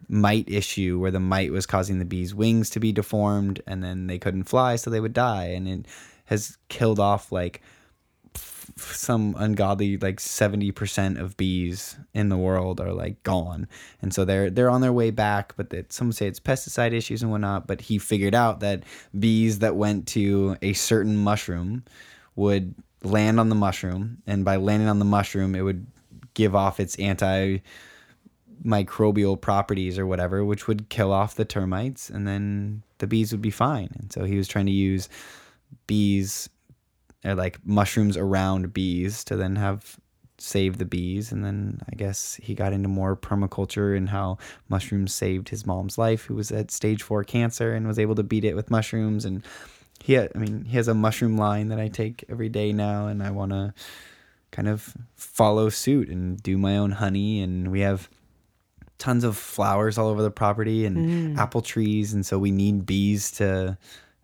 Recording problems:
none

